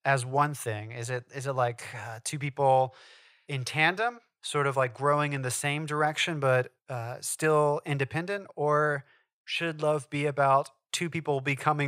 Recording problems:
abrupt cut into speech; at the end

